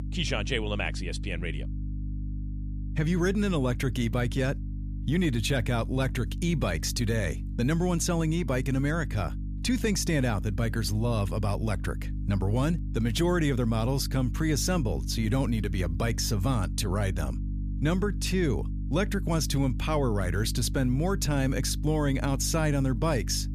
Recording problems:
electrical hum; noticeable; throughout; 50 Hz, 15 dB below the speech

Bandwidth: 14.5 kHz